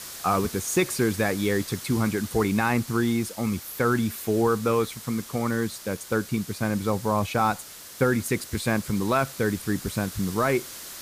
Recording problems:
hiss; noticeable; throughout; 15 dB below the speech

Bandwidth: 15 kHz